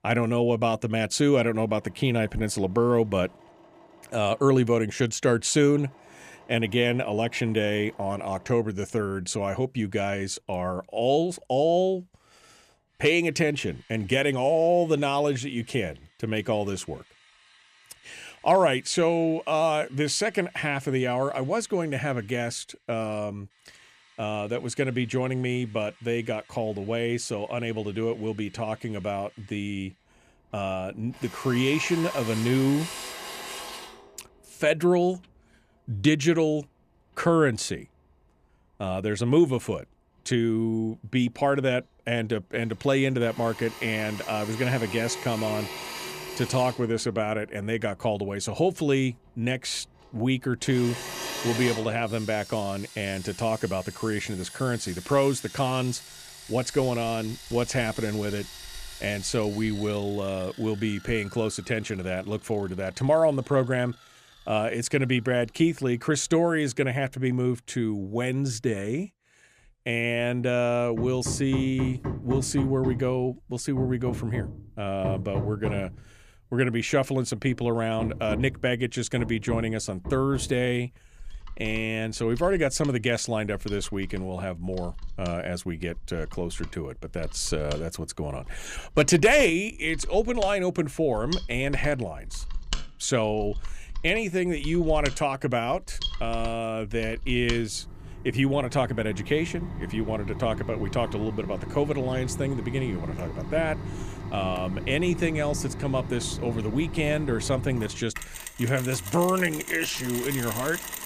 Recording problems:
machinery noise; noticeable; throughout; 10 dB below the speech

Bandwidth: 14.5 kHz